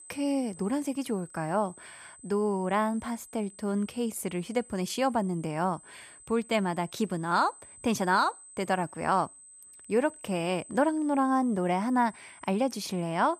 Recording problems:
high-pitched whine; noticeable; throughout; 8 kHz, 20 dB below the speech

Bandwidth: 14.5 kHz